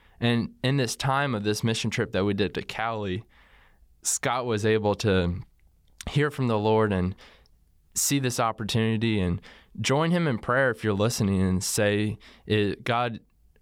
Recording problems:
none

